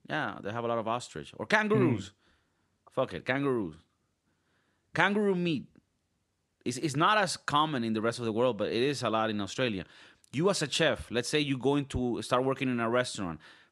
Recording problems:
none

